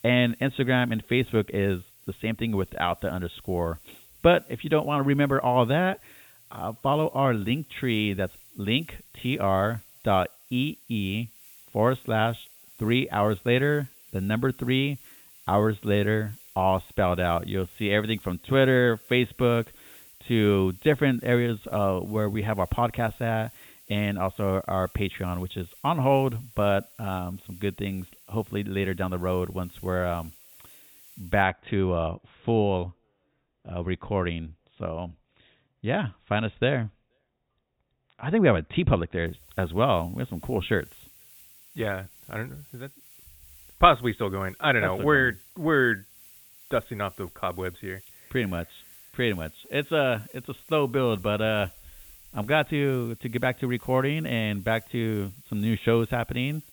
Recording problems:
high frequencies cut off; severe; nothing above 4 kHz
hiss; faint; until 31 s and from 39 s on; 20 dB below the speech

